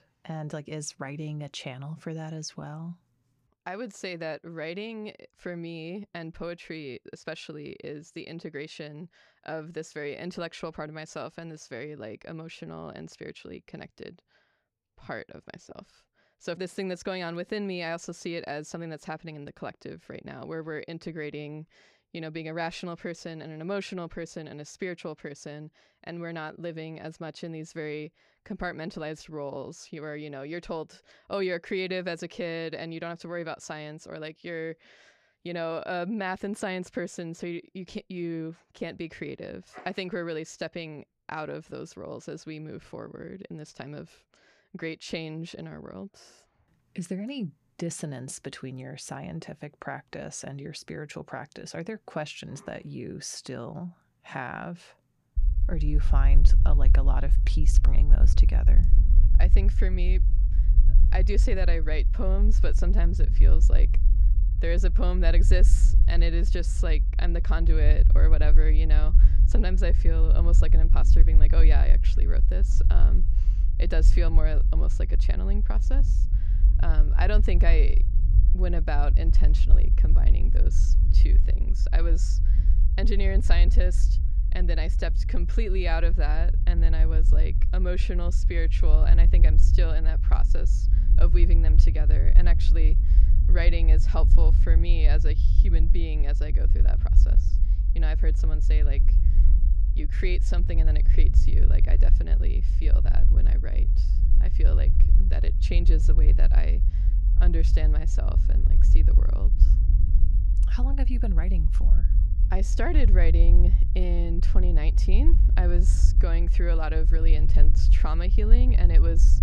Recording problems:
low rumble; loud; from 55 s on; 9 dB below the speech

